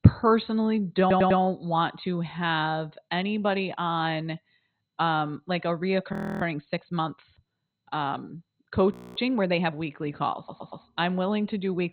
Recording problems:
garbled, watery; badly; nothing above 4 kHz
audio stuttering; at 1 s and at 10 s
audio freezing; at 6 s and at 9 s

